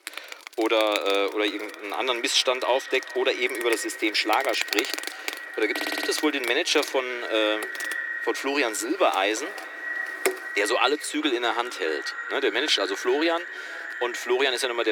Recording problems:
echo of what is said; strong; throughout; 400 ms later, 10 dB below the speech
thin; somewhat; fading below 300 Hz
animal sounds; loud; throughout; 10 dB below the speech
audio stuttering; at 6 s
abrupt cut into speech; at the end

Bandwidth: 18.5 kHz